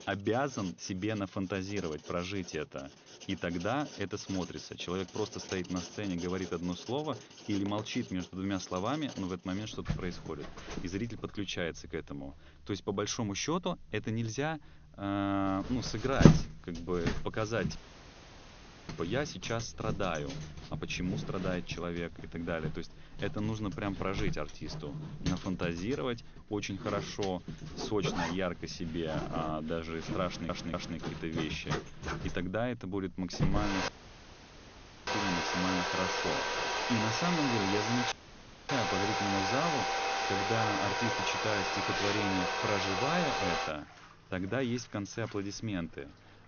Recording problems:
high frequencies cut off; noticeable; nothing above 6.5 kHz
household noises; very loud; throughout; 1 dB above the speech
audio cutting out; at 18 s for 1 s, at 34 s for 1 s and at 38 s for 0.5 s
audio stuttering; at 30 s

